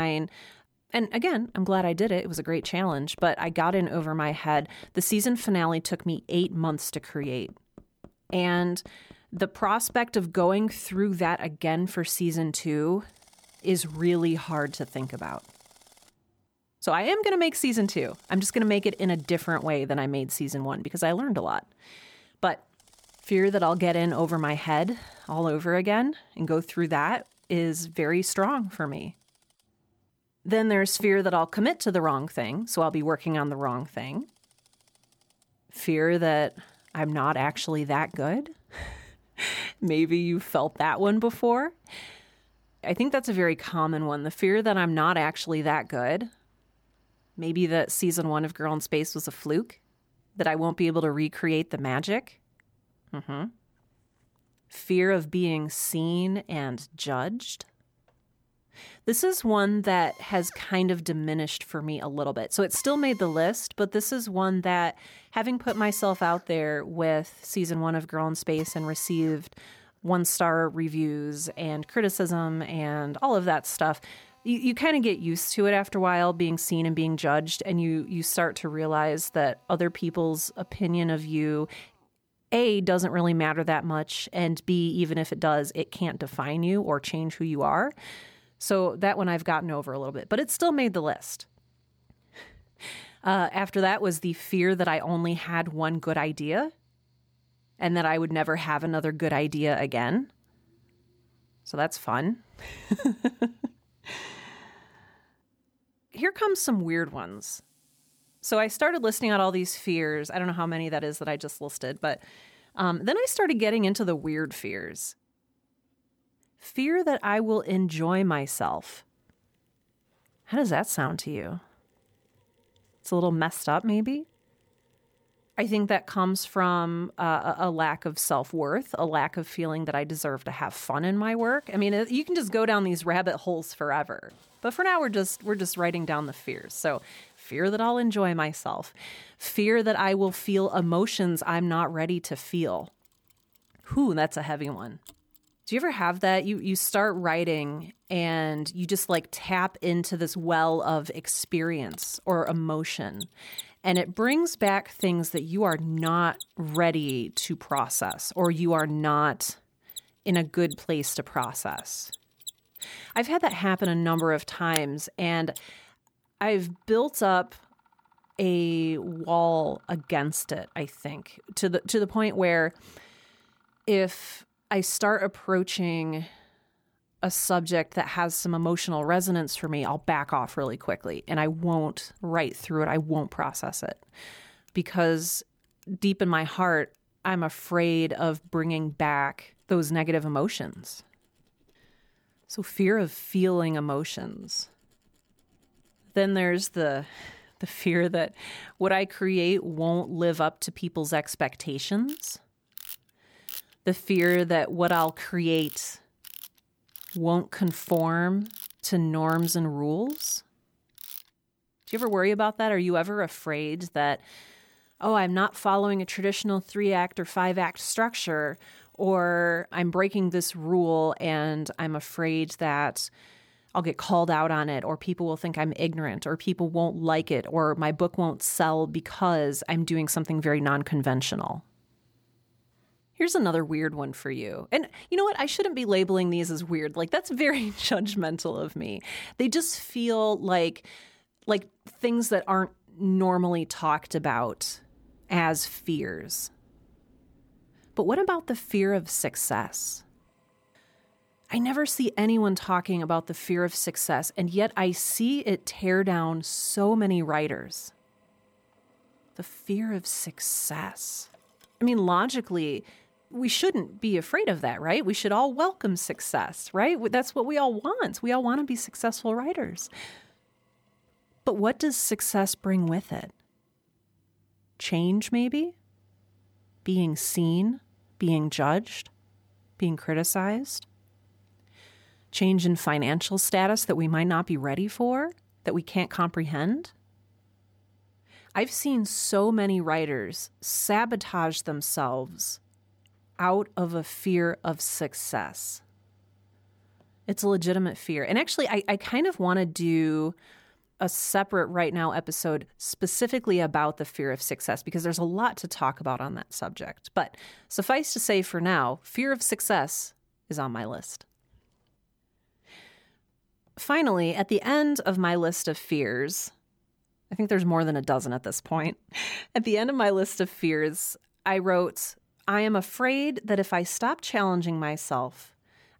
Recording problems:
machinery noise; faint; throughout; 20 dB below the speech
abrupt cut into speech; at the start

